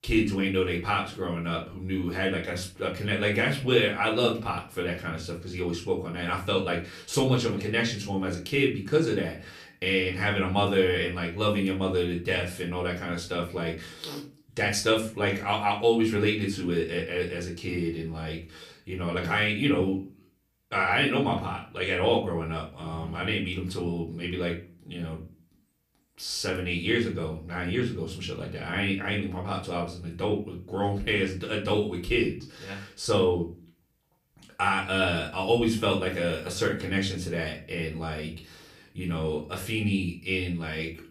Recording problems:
off-mic speech; far
room echo; slight; dies away in 0.3 s

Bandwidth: 15 kHz